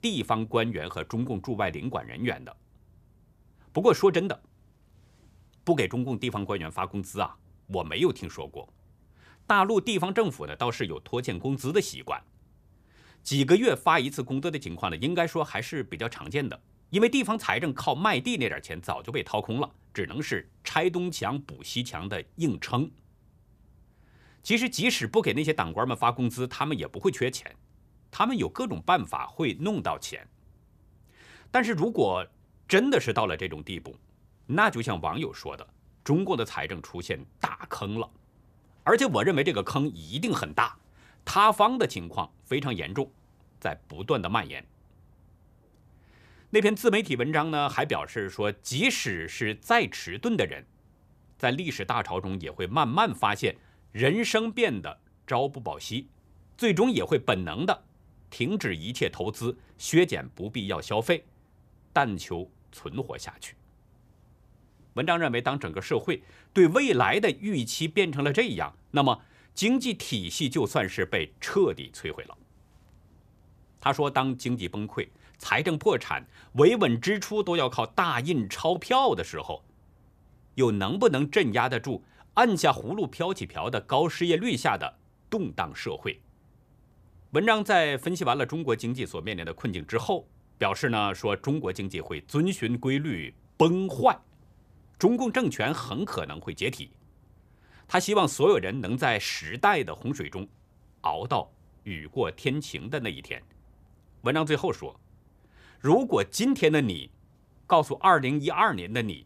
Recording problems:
none

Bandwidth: 14.5 kHz